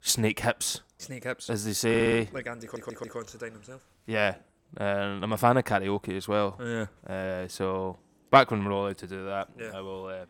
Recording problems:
audio stuttering; at 2 s and at 2.5 s

